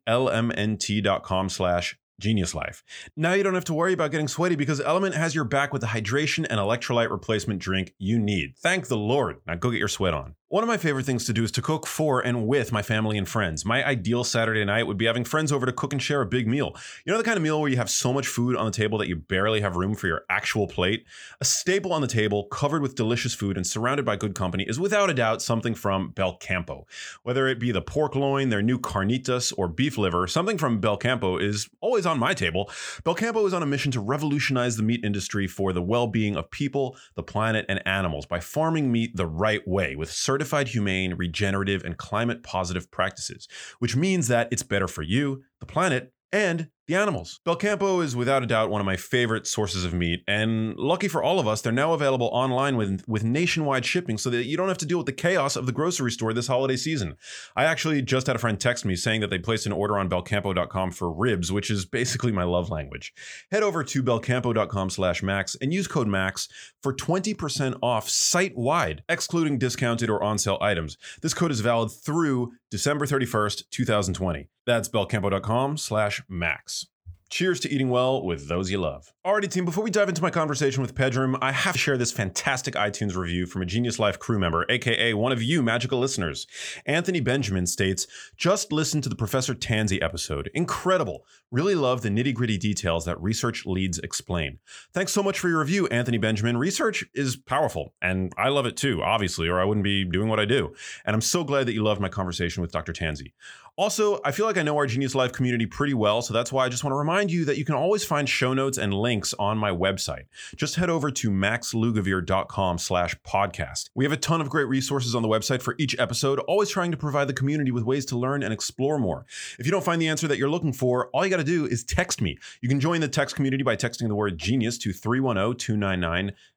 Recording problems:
none

